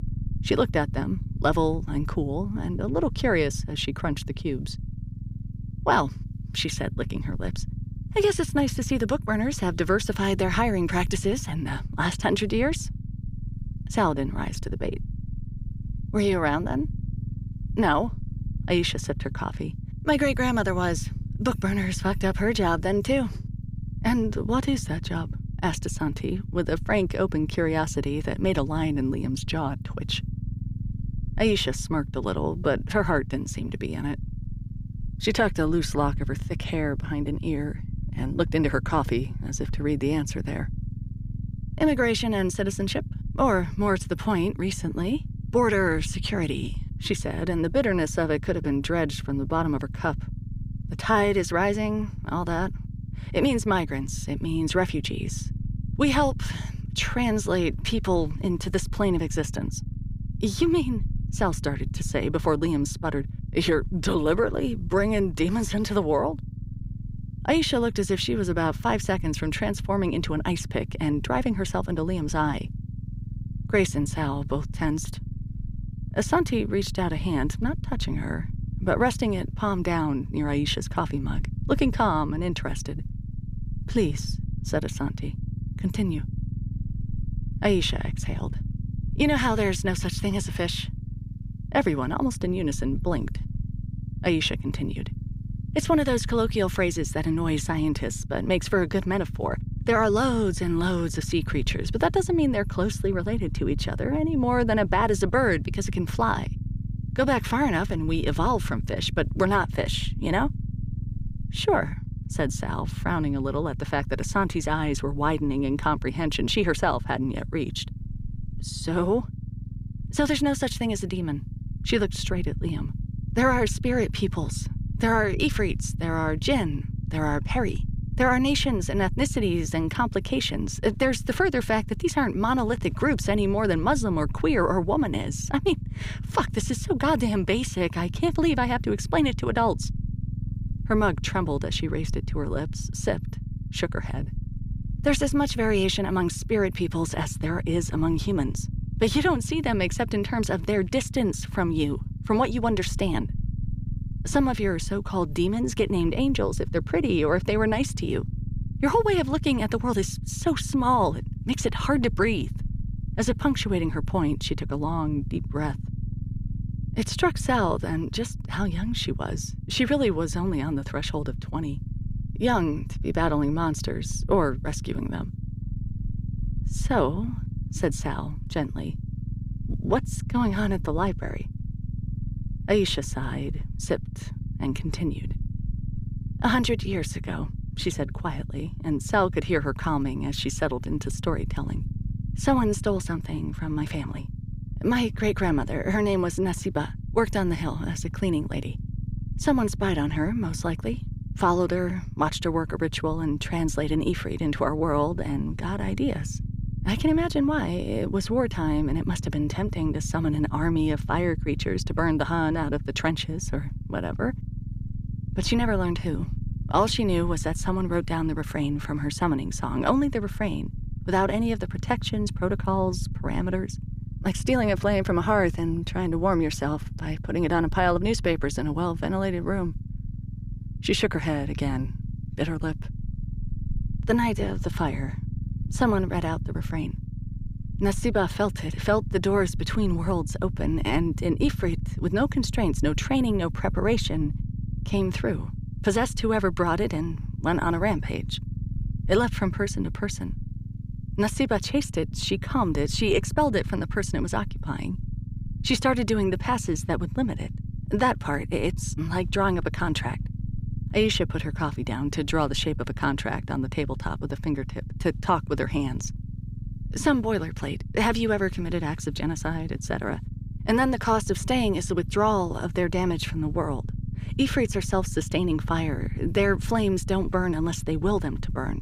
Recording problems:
low rumble; noticeable; throughout; 20 dB below the speech

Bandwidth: 15.5 kHz